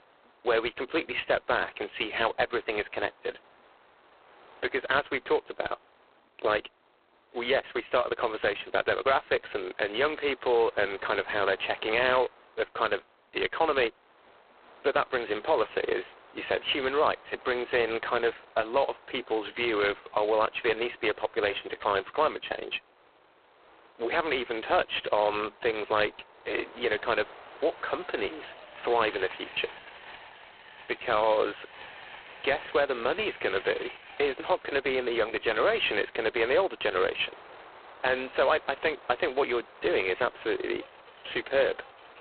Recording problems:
phone-call audio; poor line; nothing above 4 kHz
train or aircraft noise; faint; throughout; 20 dB below the speech

